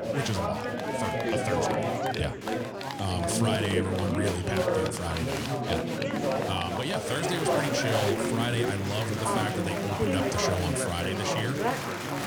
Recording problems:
chatter from many people; very loud; throughout; 3 dB above the speech

